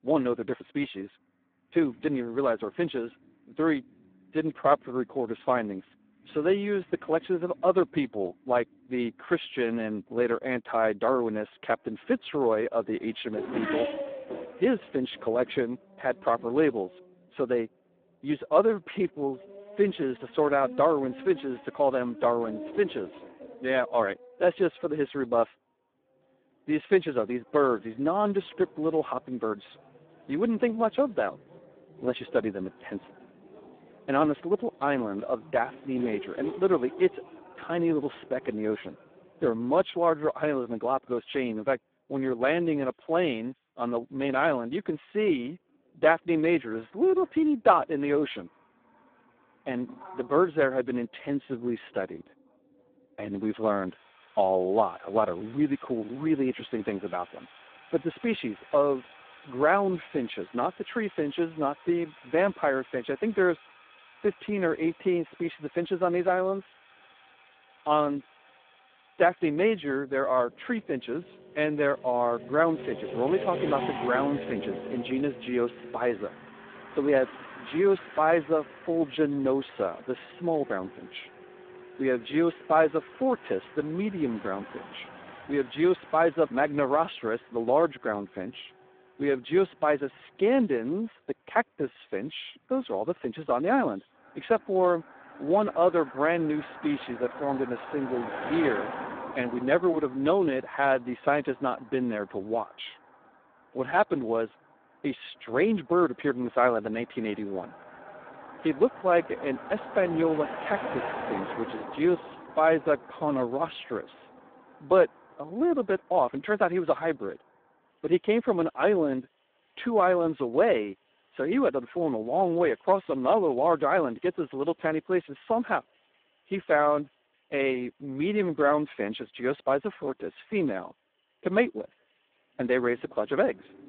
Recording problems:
phone-call audio; poor line
traffic noise; noticeable; throughout; 15 dB below the speech

